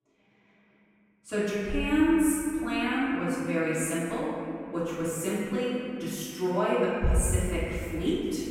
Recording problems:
room echo; strong; dies away in 2.5 s
off-mic speech; far

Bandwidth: 16 kHz